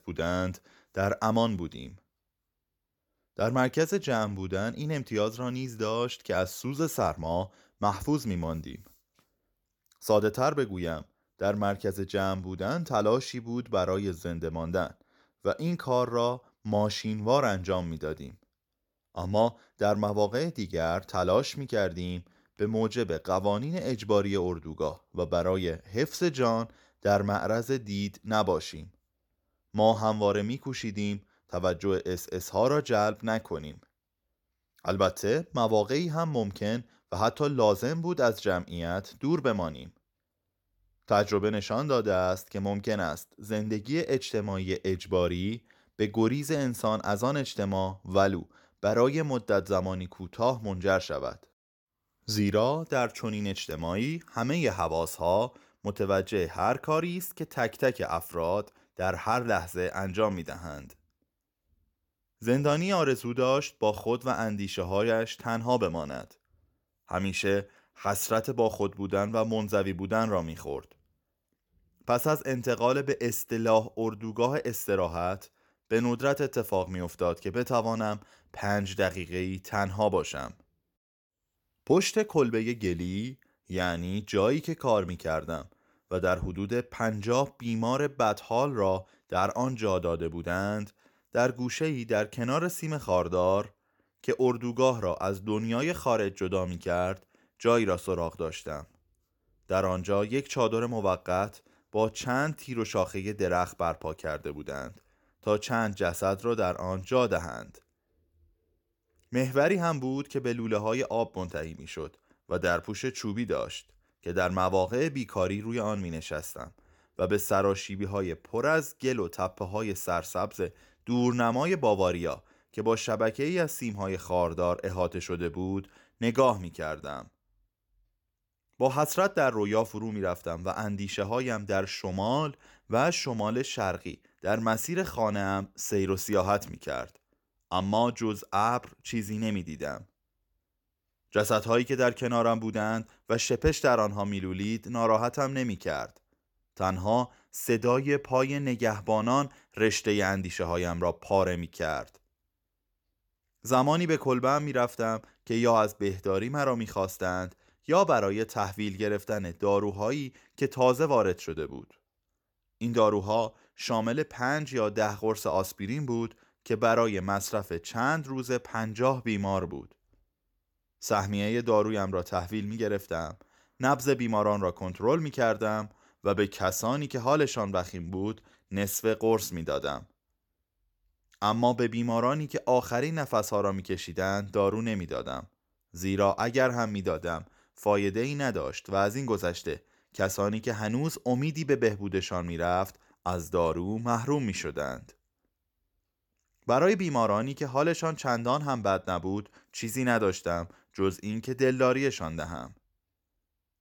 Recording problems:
none

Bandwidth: 17.5 kHz